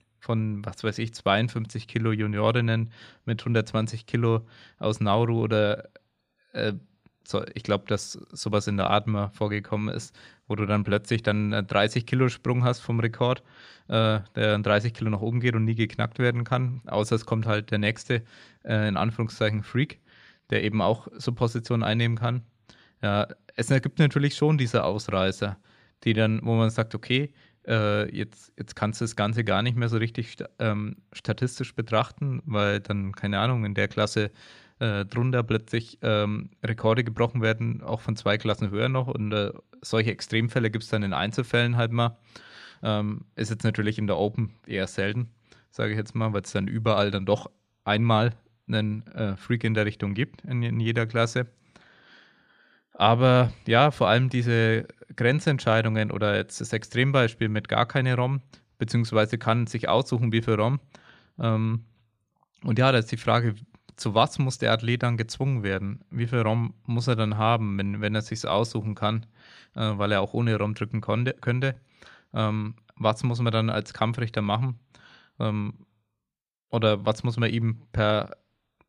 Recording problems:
none

